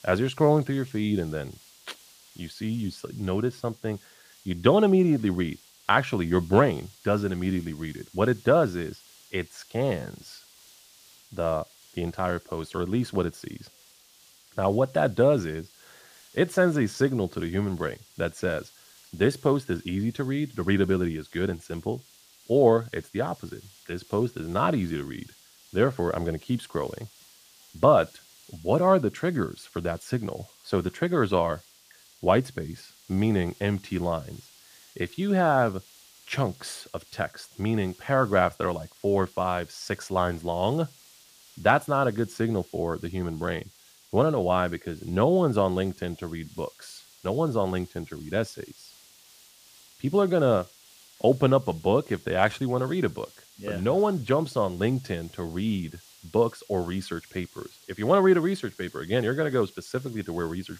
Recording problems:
hiss; faint; throughout; 25 dB below the speech

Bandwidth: 15 kHz